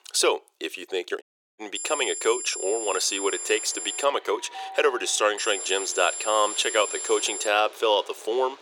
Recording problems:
thin; very; fading below 400 Hz
high-pitched whine; loud; from 2 to 4 s and from 5.5 to 7.5 s; 7.5 kHz, 6 dB below the speech
train or aircraft noise; noticeable; from 3 s on; 20 dB below the speech
uneven, jittery; slightly; from 1 to 7 s
audio cutting out; at 1 s

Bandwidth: 17.5 kHz